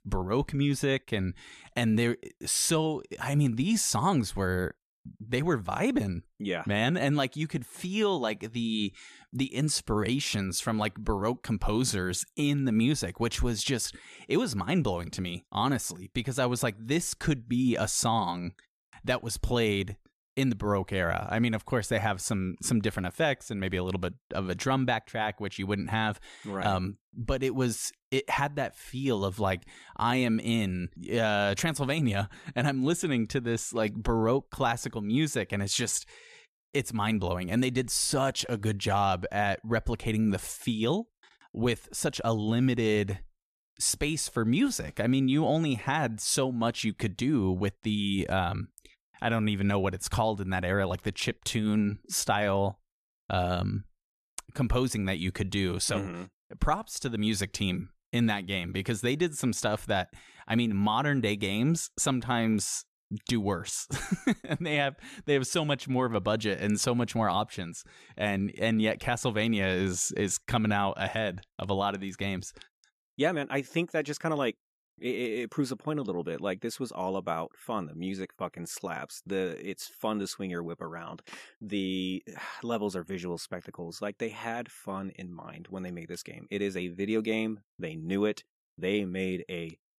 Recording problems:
none

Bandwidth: 14 kHz